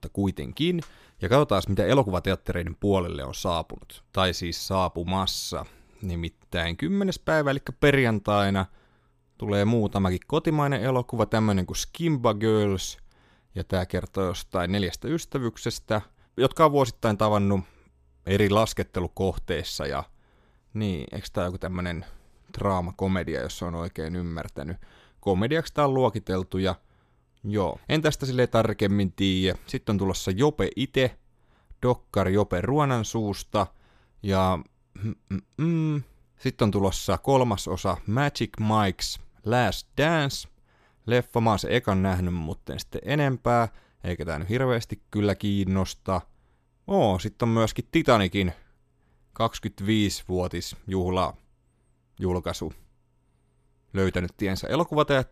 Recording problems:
none

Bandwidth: 14.5 kHz